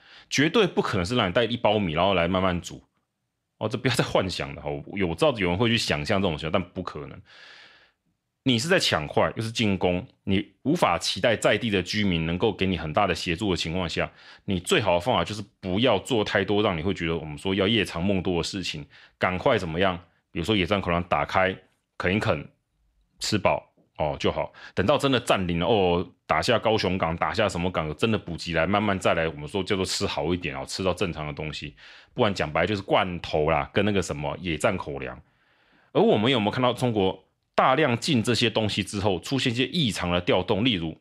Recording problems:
none

